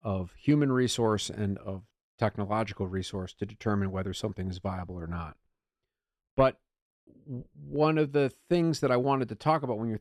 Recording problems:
none

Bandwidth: 13.5 kHz